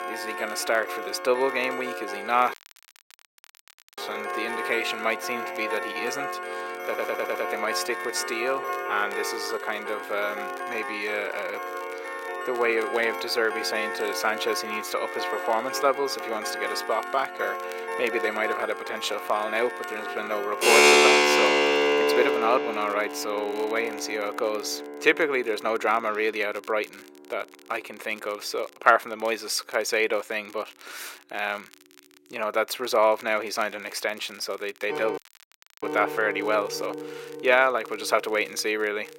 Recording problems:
thin; very; fading below 400 Hz
background music; loud; throughout; 1 dB below the speech
crackle, like an old record; faint; 25 dB below the speech
audio cutting out; at 2.5 s for 1.5 s and at 35 s for 0.5 s
audio stuttering; at 7 s

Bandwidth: 16 kHz